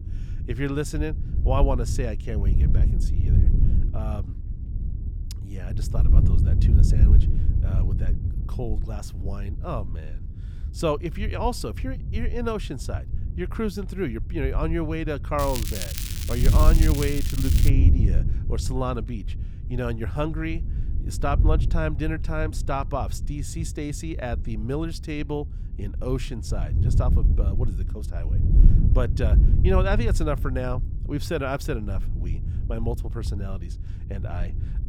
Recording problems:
crackling; loud; from 15 to 18 s; 3 dB below the speech
wind noise on the microphone; occasional gusts; 10 dB below the speech

